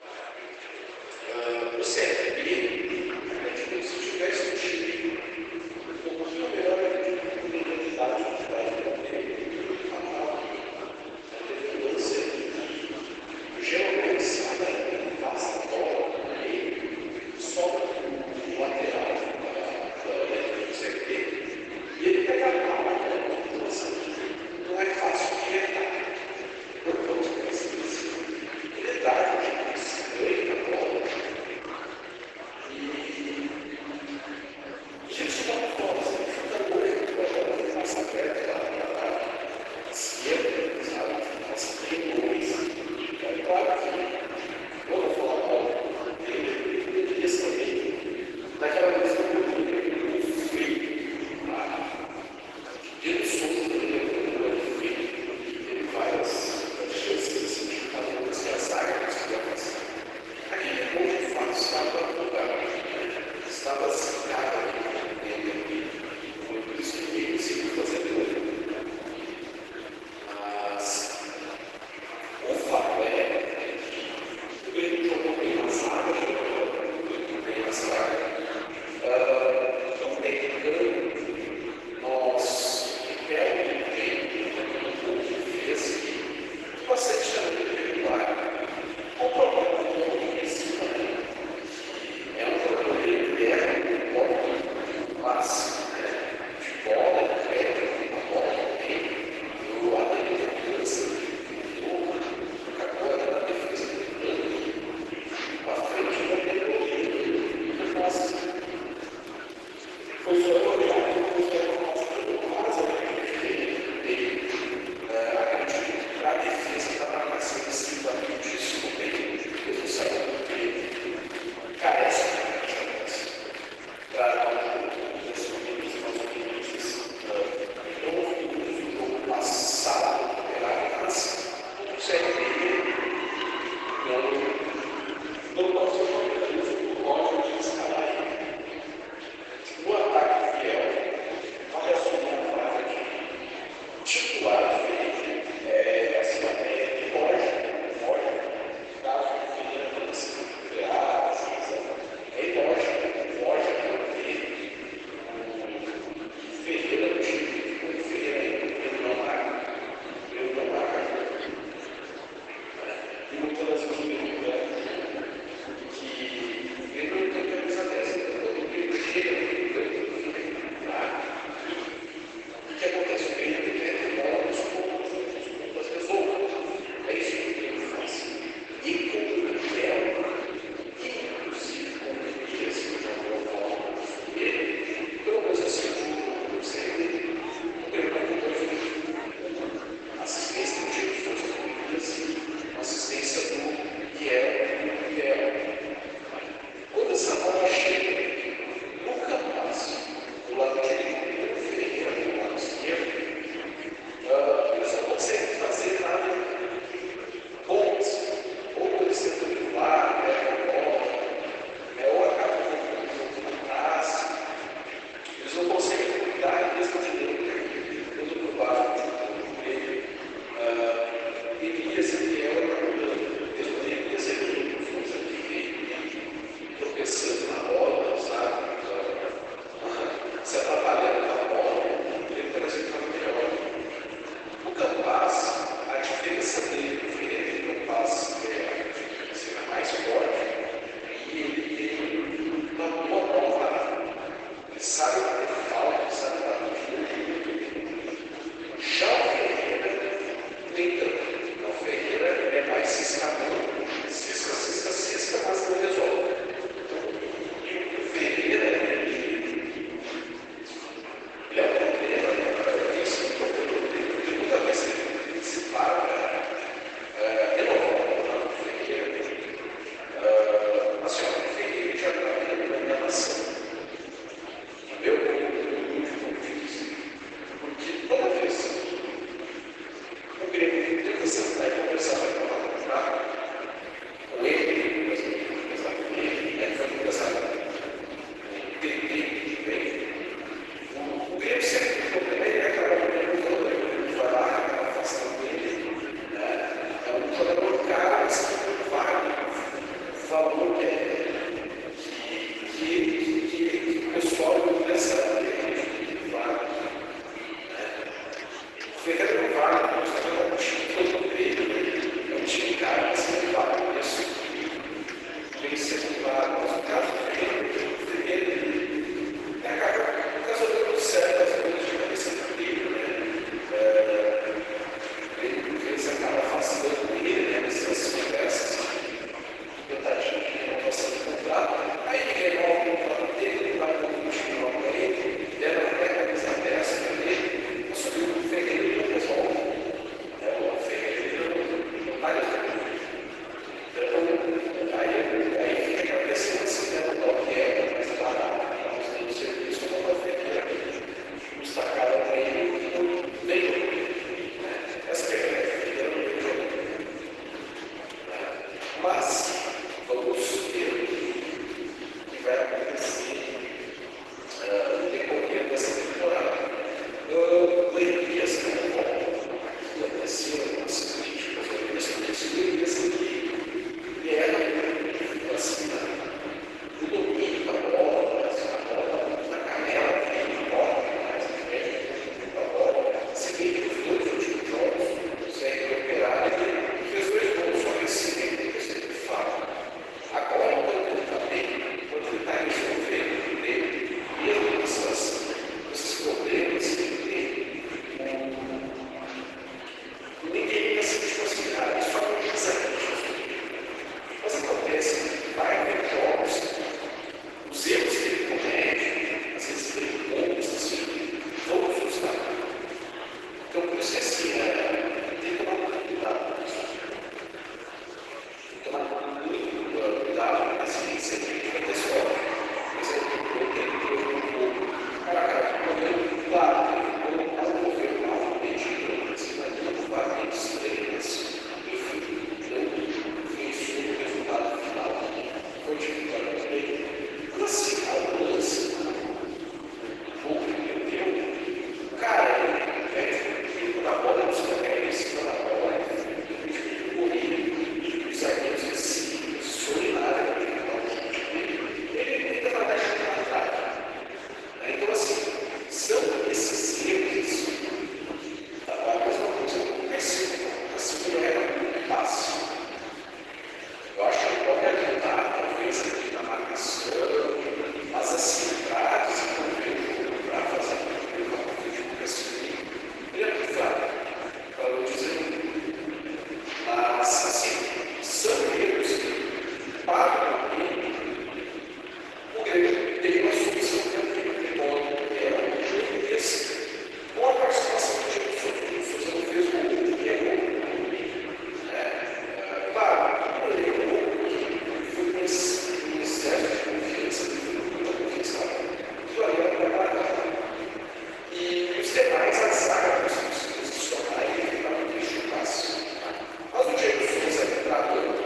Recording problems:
room echo; strong; dies away in 3 s
off-mic speech; far
garbled, watery; badly; nothing above 8 kHz
thin; somewhat; fading below 350 Hz
murmuring crowd; noticeable; throughout; 10 dB below the speech

